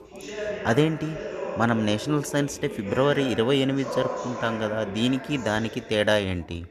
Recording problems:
background chatter; loud; throughout; 3 voices, 9 dB below the speech

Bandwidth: 13.5 kHz